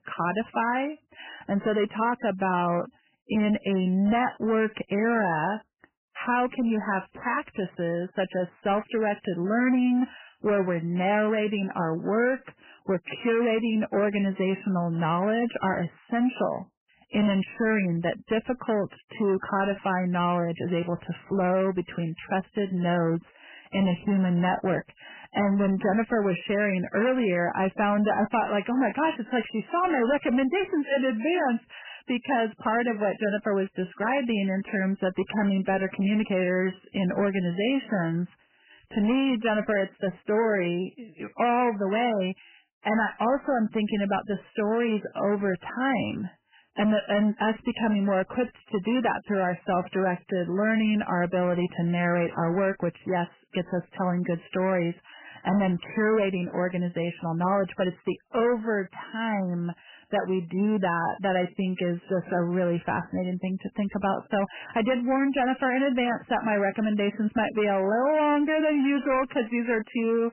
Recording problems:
garbled, watery; badly; nothing above 3 kHz
distortion; slight; 10 dB below the speech

